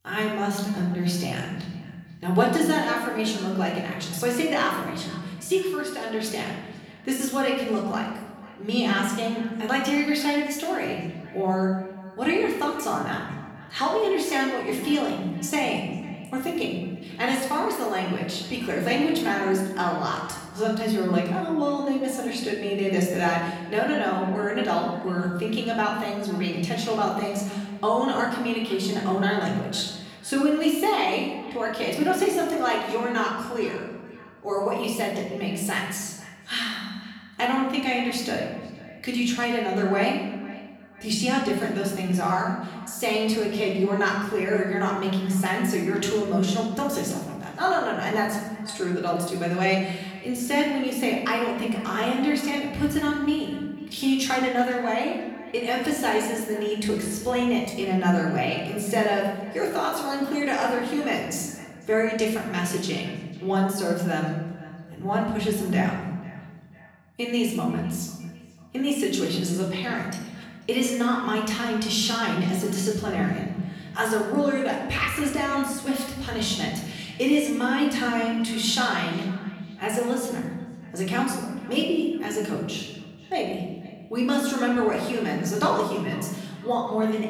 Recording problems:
off-mic speech; far
room echo; noticeable; dies away in 1.1 s
echo of what is said; faint; throughout; 500 ms later, 20 dB below the speech

